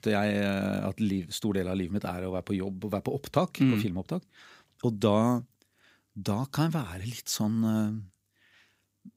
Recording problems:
none

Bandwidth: 15.5 kHz